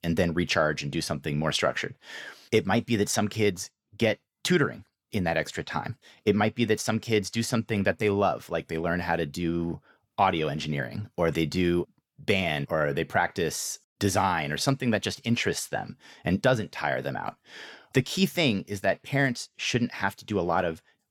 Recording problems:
none

